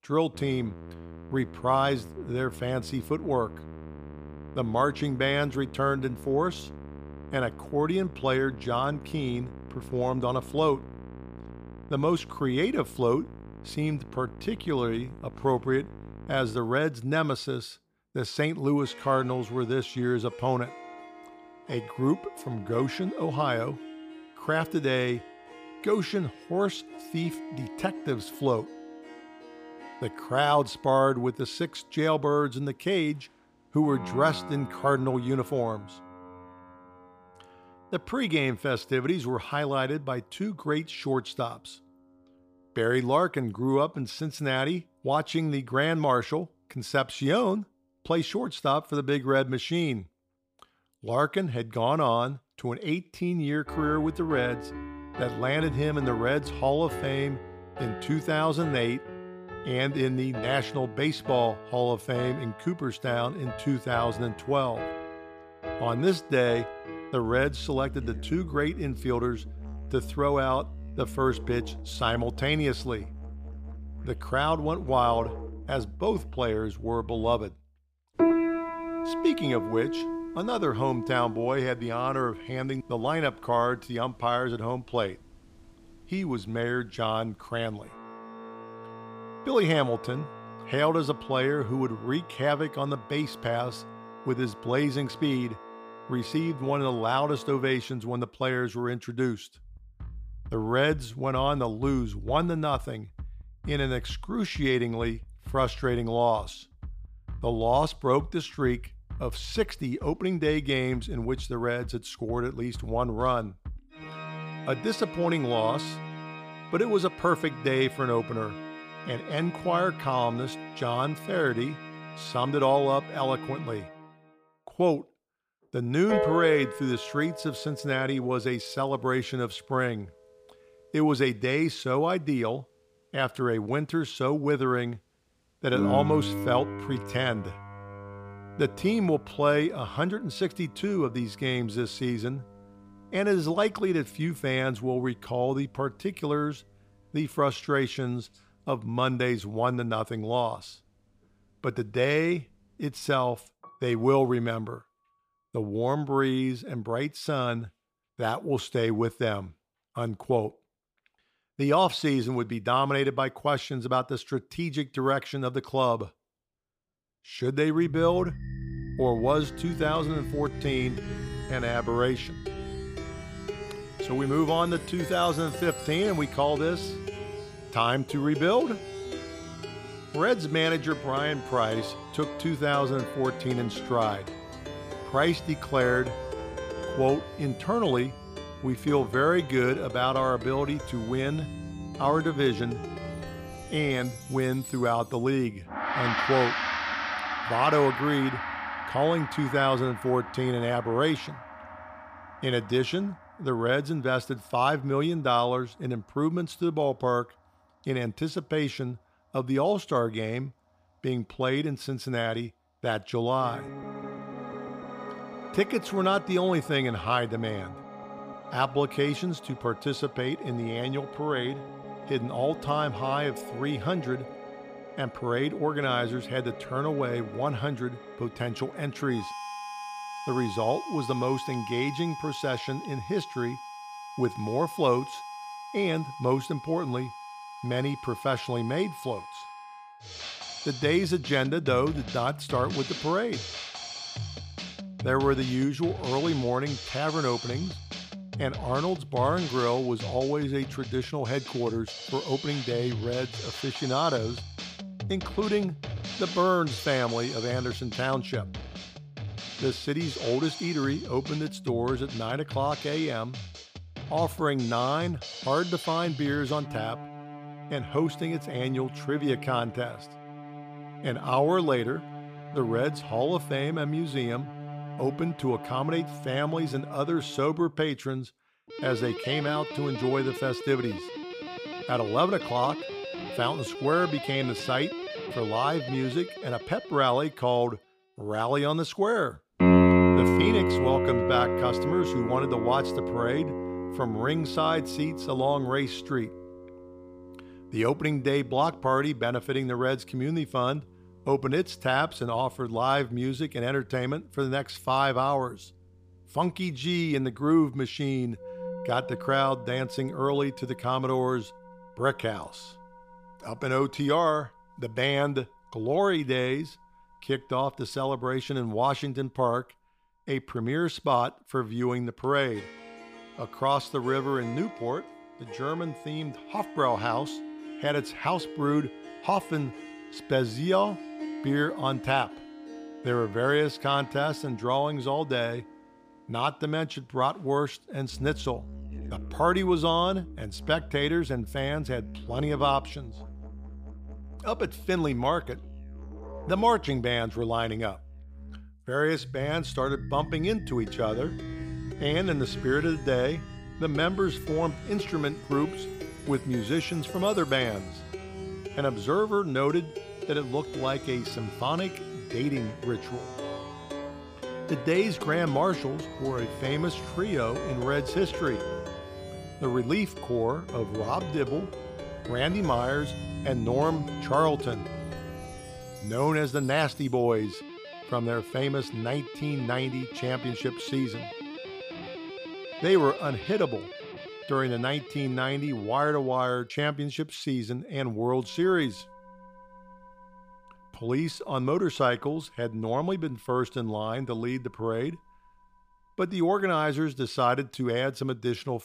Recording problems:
background music; loud; throughout; 9 dB below the speech

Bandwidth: 15 kHz